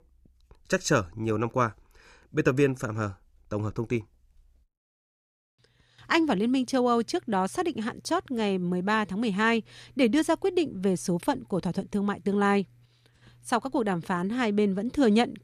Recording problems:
none

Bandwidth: 14.5 kHz